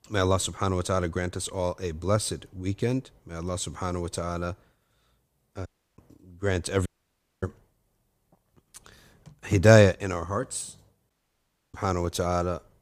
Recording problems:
audio cutting out; at 5.5 s, at 7 s for 0.5 s and at 11 s for 0.5 s

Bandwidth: 15 kHz